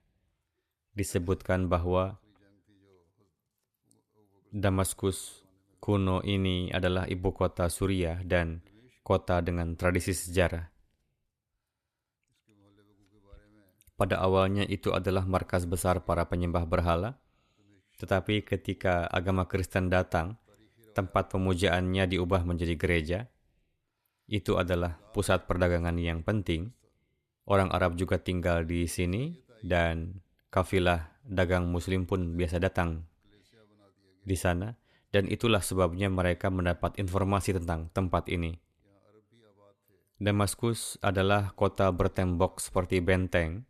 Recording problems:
none

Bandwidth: 14.5 kHz